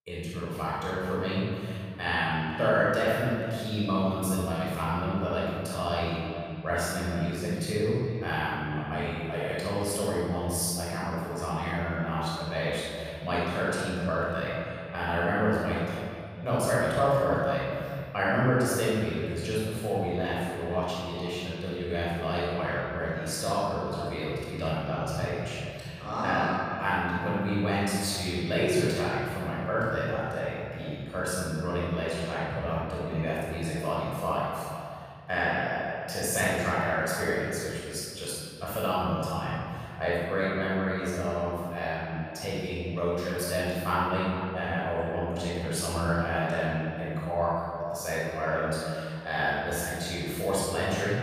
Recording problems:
room echo; strong; dies away in 2.3 s
off-mic speech; far
echo of what is said; noticeable; throughout; 430 ms later, 15 dB below the speech

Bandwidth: 15 kHz